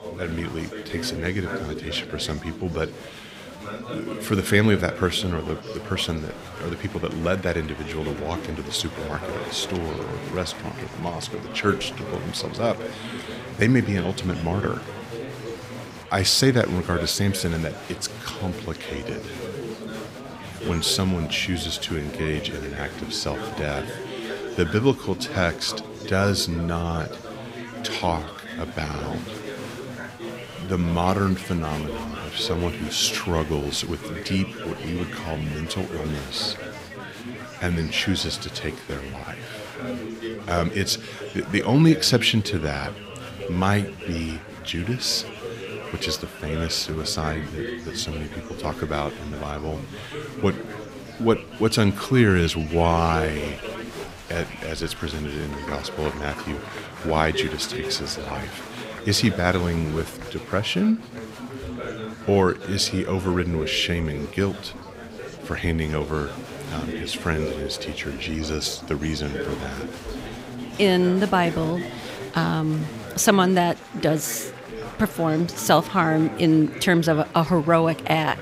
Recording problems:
chatter from many people; noticeable; throughout; 10 dB below the speech

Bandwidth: 15.5 kHz